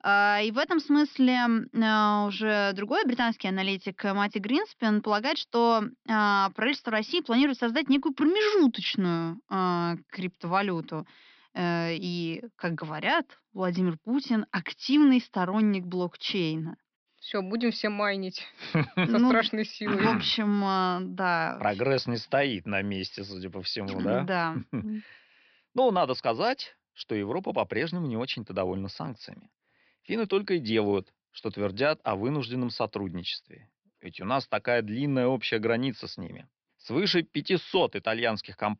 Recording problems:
high frequencies cut off; noticeable; nothing above 5.5 kHz

